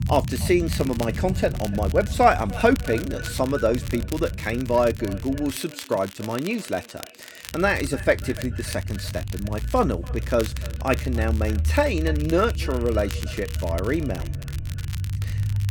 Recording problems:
echo of what is said; faint; throughout; 290 ms later, 20 dB below the speech
crackle, like an old record; noticeable; 15 dB below the speech
low rumble; faint; until 5.5 s and from 7.5 s on; 20 dB below the speech

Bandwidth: 17.5 kHz